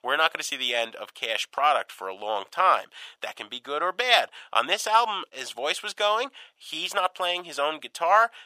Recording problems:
thin; very; fading below 750 Hz

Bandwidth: 15 kHz